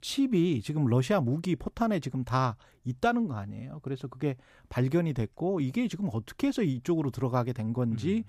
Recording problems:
none

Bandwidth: 14.5 kHz